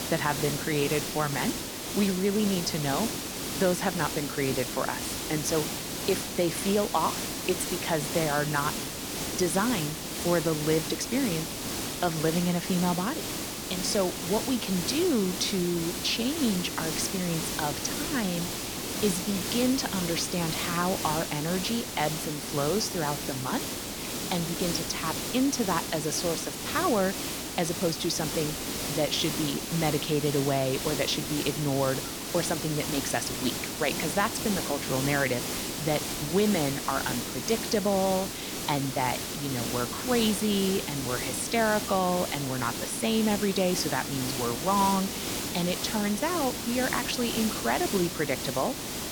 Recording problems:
hiss; loud; throughout; 3 dB below the speech

